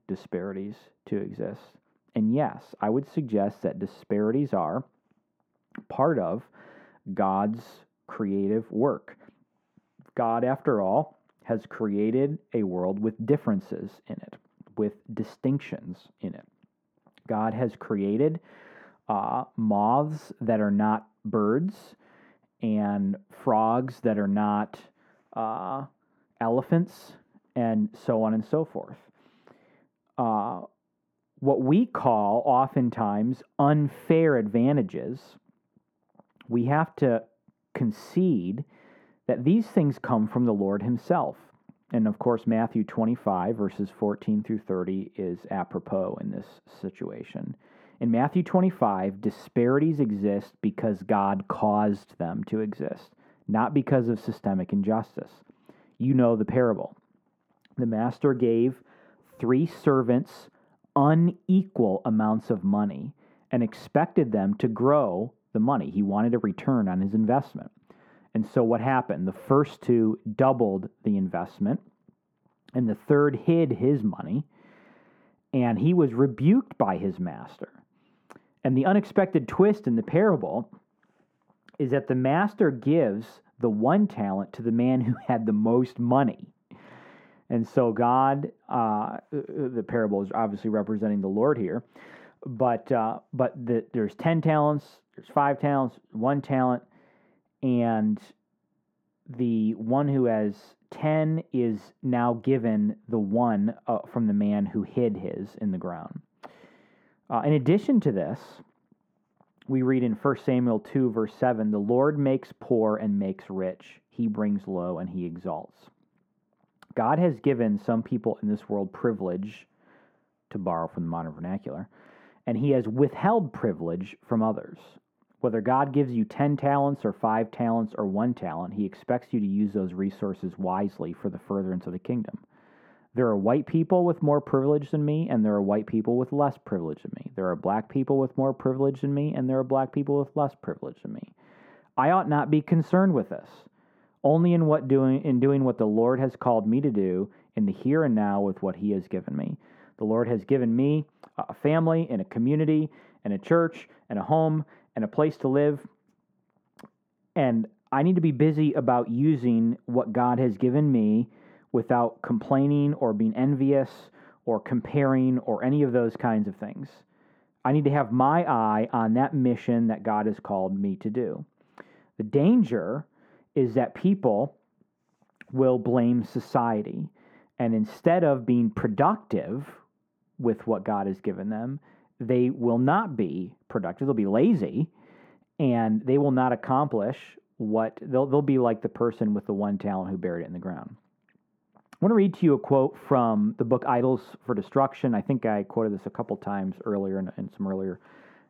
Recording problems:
muffled; very; fading above 2.5 kHz

